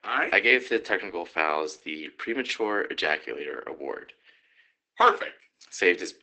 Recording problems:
garbled, watery; badly; nothing above 8 kHz
thin; somewhat; fading below 250 Hz

